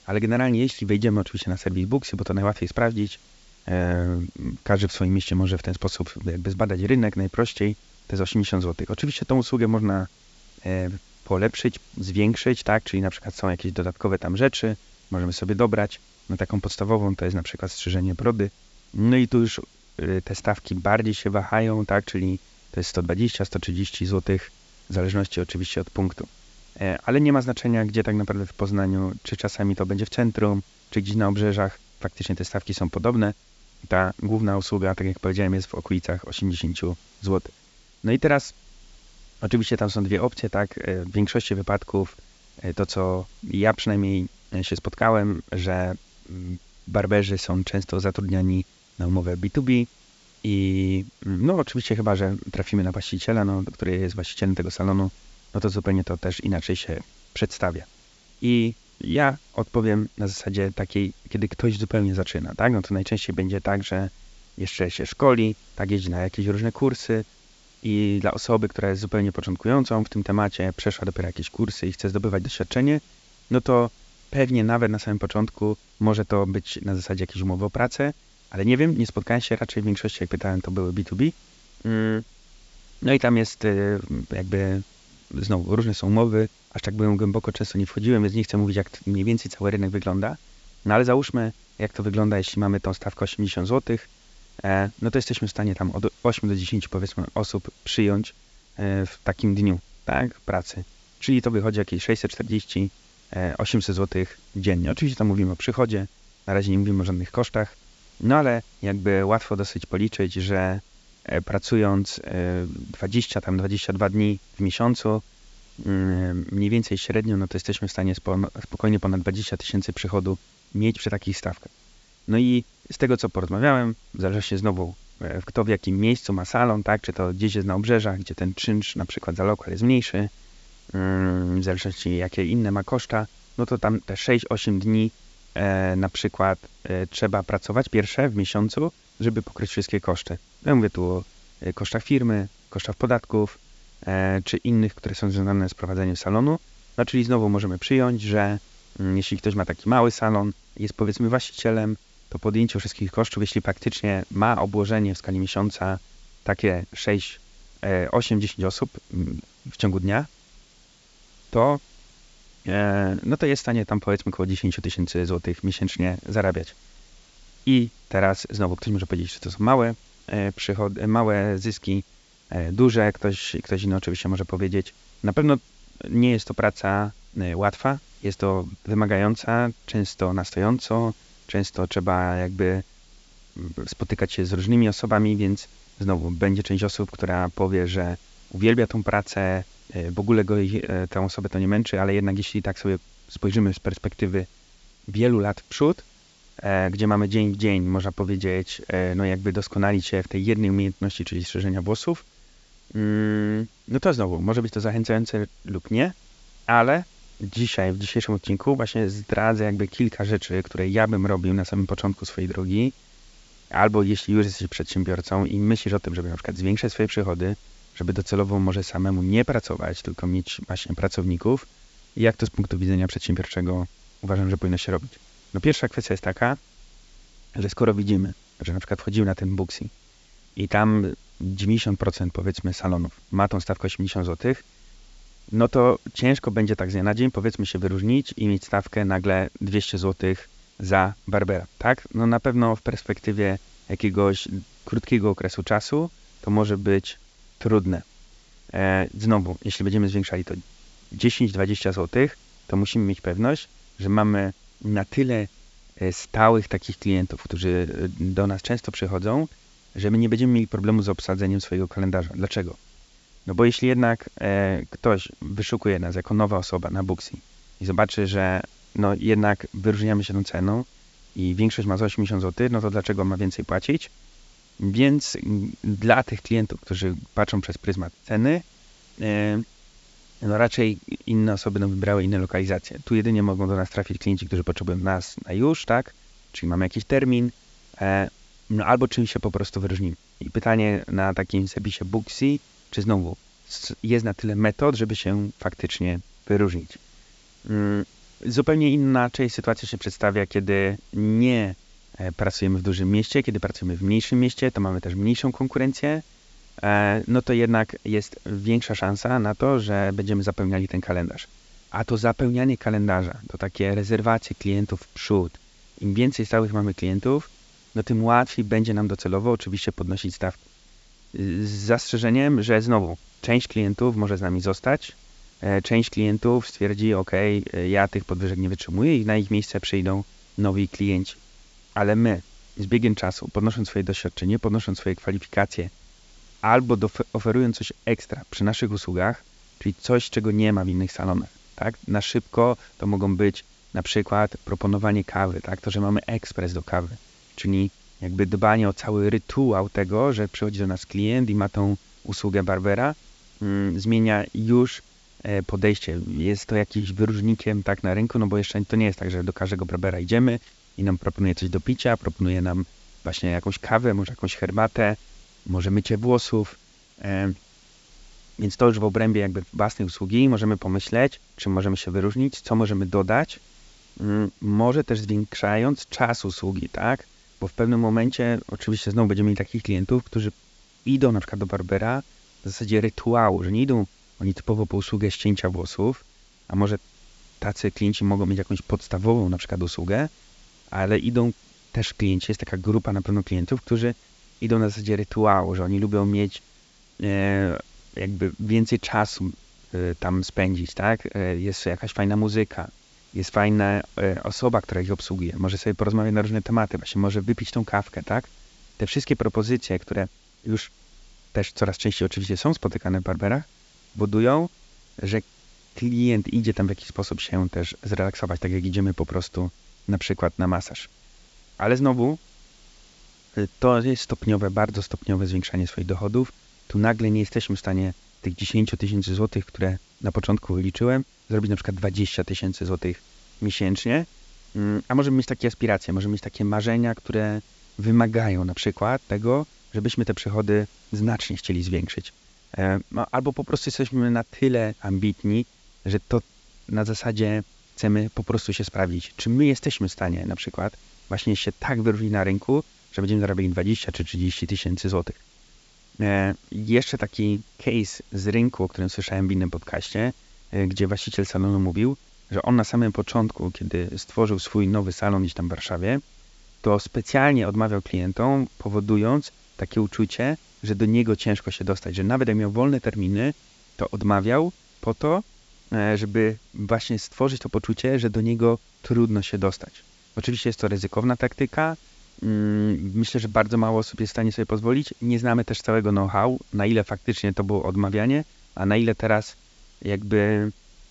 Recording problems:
high frequencies cut off; noticeable; nothing above 8 kHz
hiss; faint; throughout; 30 dB below the speech

